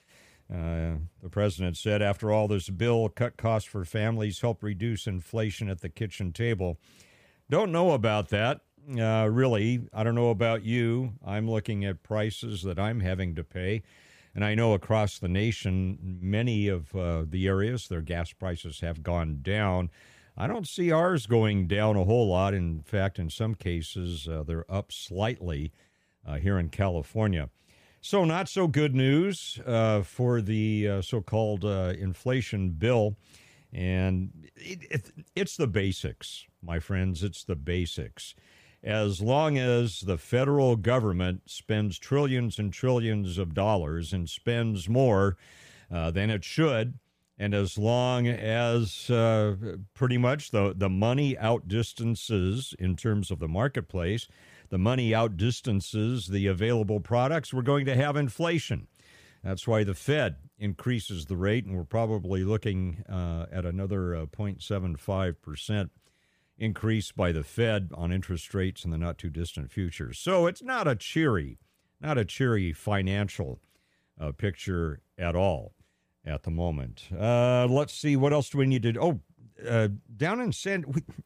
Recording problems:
none

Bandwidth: 15 kHz